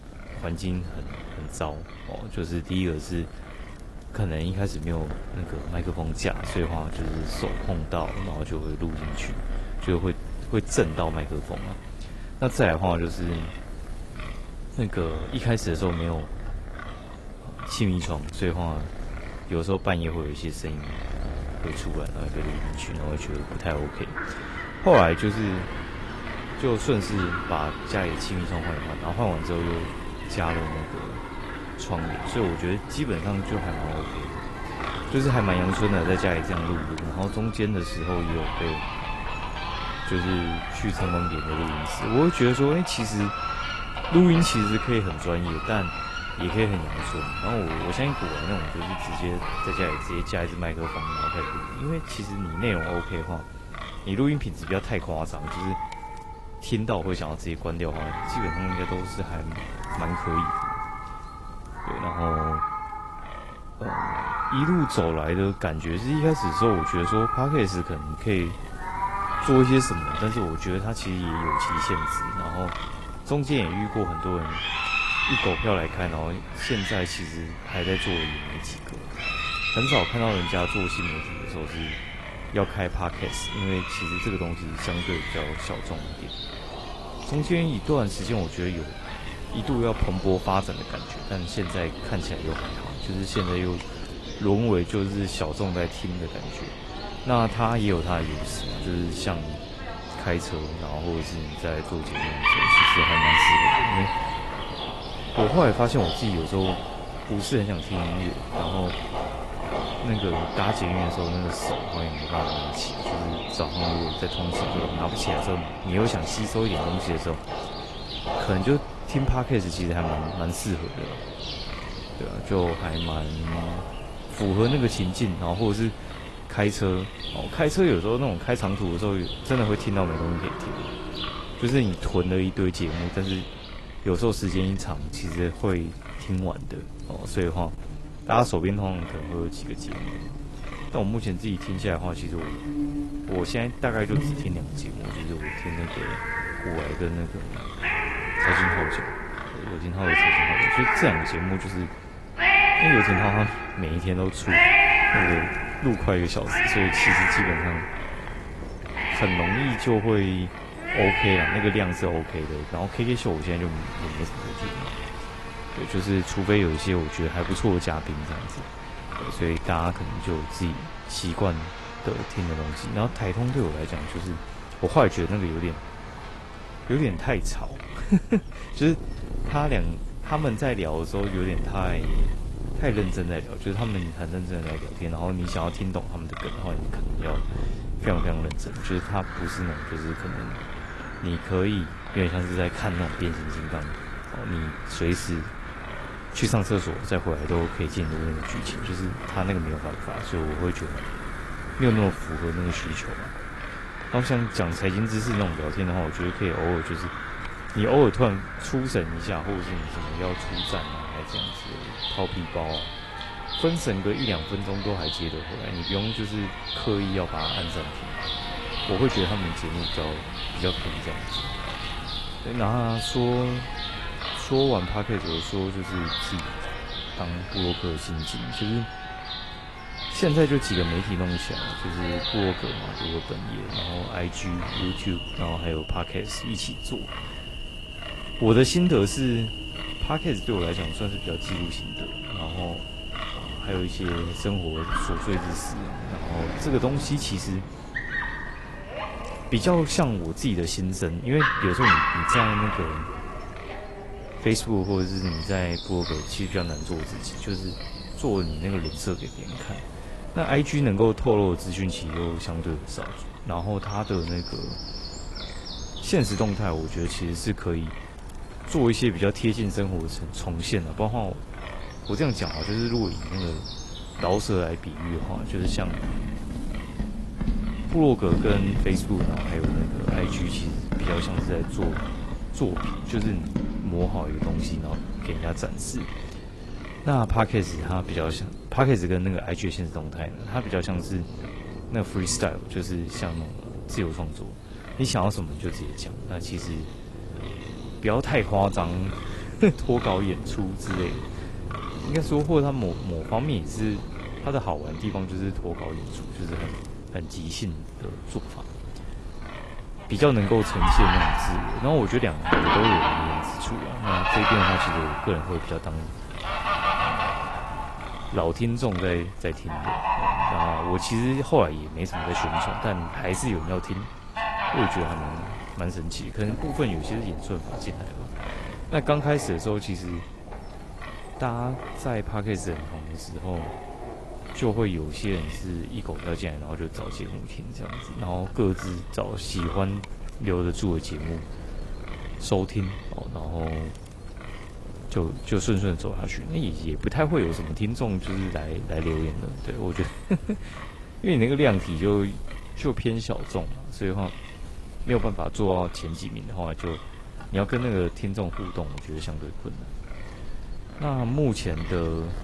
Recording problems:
garbled, watery; slightly; nothing above 11.5 kHz
animal sounds; loud; throughout; 2 dB below the speech
wind noise on the microphone; occasional gusts; 10 dB below the speech

